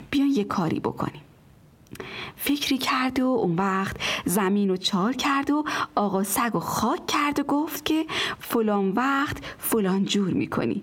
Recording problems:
squashed, flat; heavily

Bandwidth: 16.5 kHz